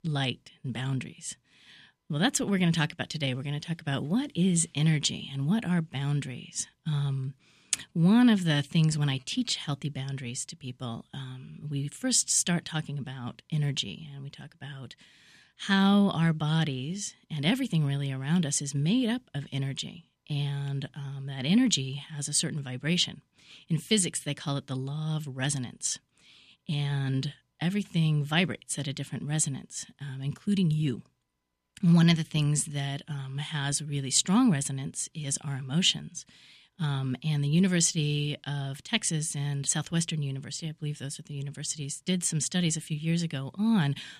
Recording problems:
none

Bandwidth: 14.5 kHz